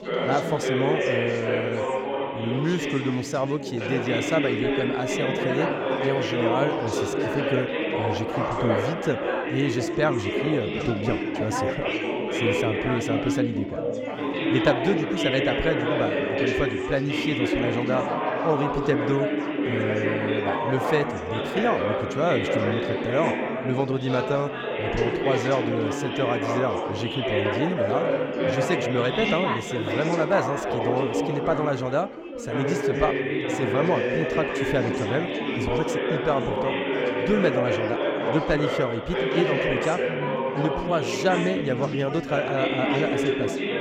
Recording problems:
chatter from many people; very loud; throughout; 1 dB above the speech

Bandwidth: 17.5 kHz